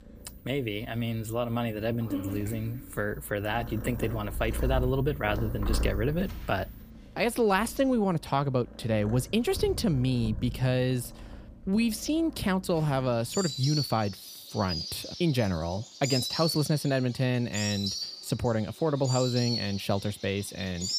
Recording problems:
animal sounds; loud; throughout; 7 dB below the speech

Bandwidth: 15 kHz